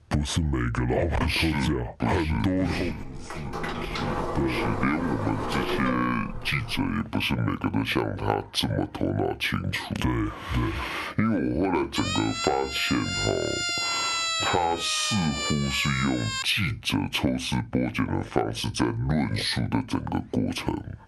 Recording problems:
squashed, flat; heavily
wrong speed and pitch; too slow and too low; 0.7 times normal speed
door banging; noticeable; from 2 to 7 s; peak 2 dB below the speech
siren; loud; from 12 to 16 s; peak 3 dB above the speech

